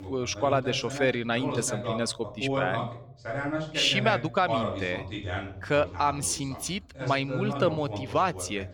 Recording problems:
voice in the background; loud; throughout; 6 dB below the speech

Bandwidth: 18 kHz